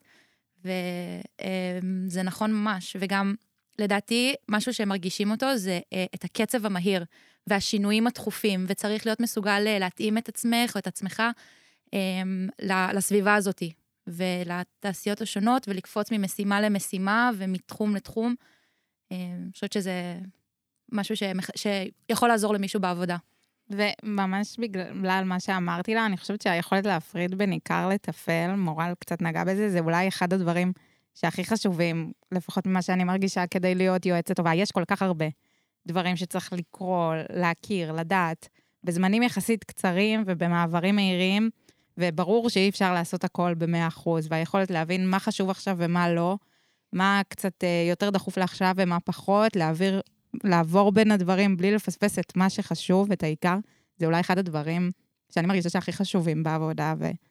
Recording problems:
uneven, jittery; strongly; from 15 to 56 s

